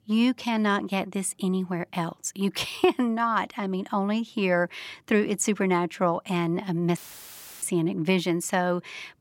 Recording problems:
audio cutting out; filled with static; at 7 s for 0.5 s

